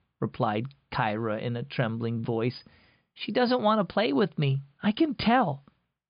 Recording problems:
high frequencies cut off; severe; nothing above 5 kHz

